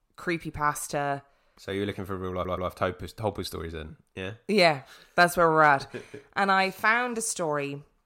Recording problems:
audio stuttering; at 2.5 s

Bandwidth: 16 kHz